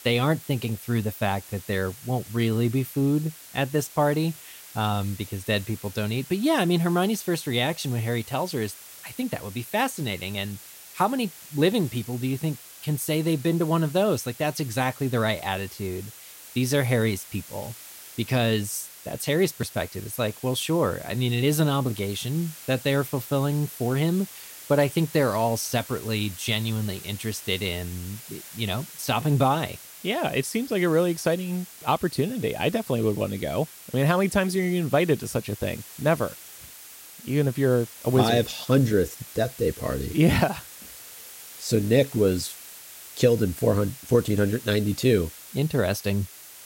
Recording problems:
hiss; noticeable; throughout; 15 dB below the speech

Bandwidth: 16 kHz